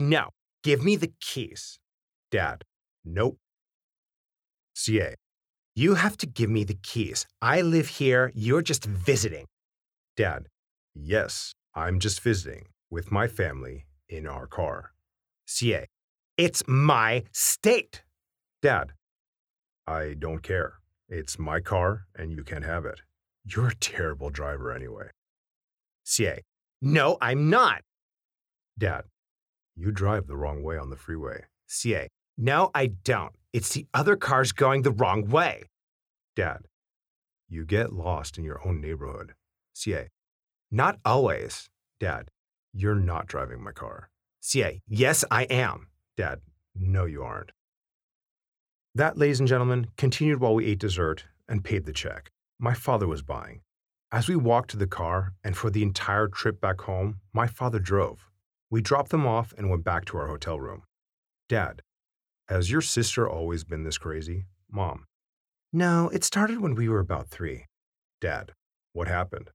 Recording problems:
abrupt cut into speech; at the start

